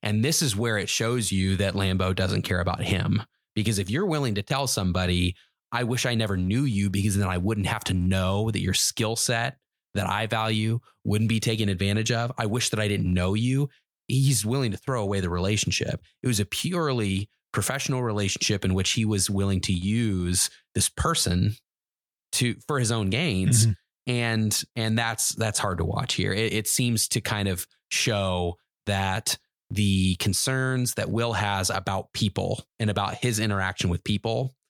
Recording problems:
none

